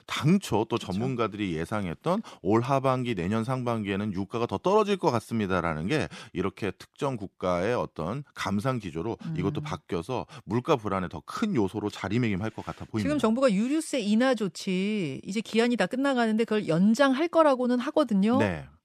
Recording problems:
none

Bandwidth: 14 kHz